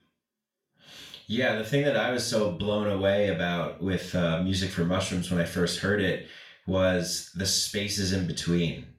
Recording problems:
off-mic speech; far
room echo; slight; dies away in 0.4 s

